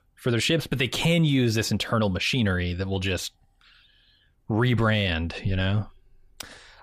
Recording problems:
none

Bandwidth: 15 kHz